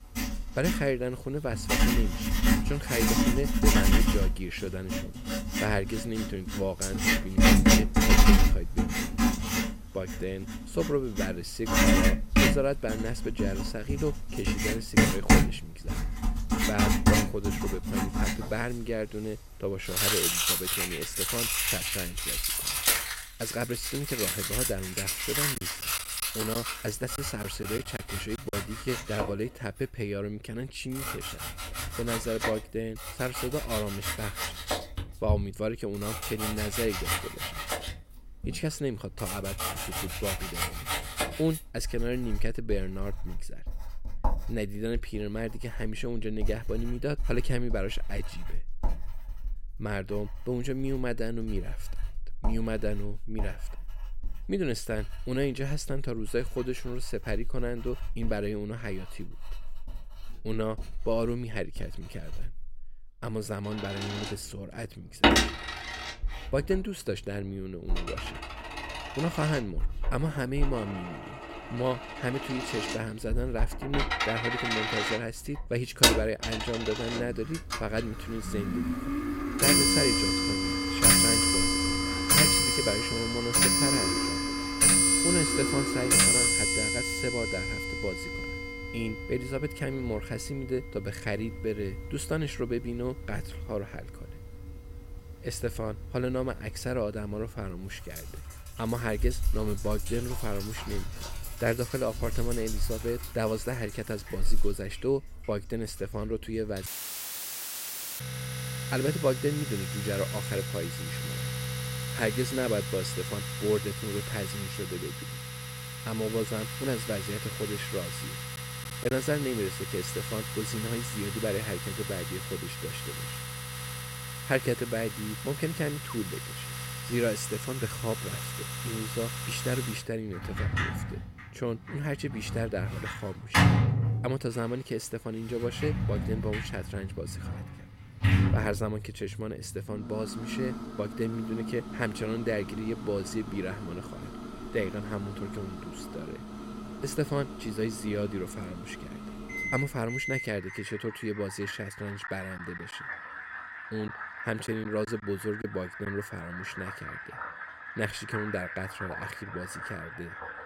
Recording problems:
household noises; very loud; throughout; 5 dB above the speech
choppy; very; from 26 to 29 s, at 1:59 and from 2:33 to 2:36; 6% of the speech affected
audio cutting out; filled with static; at 1:47 for 1.5 s

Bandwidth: 16 kHz